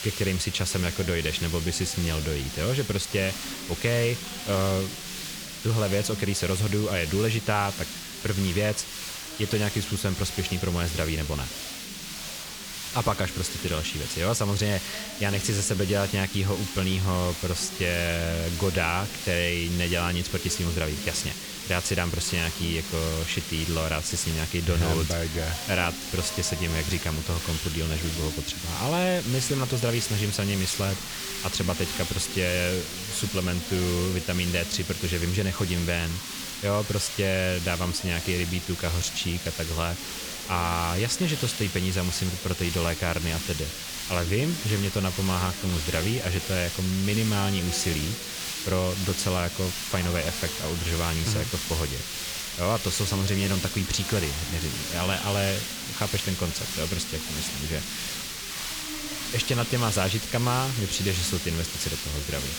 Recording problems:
hiss; loud; throughout; 5 dB below the speech
chatter from many people; noticeable; throughout; 15 dB below the speech

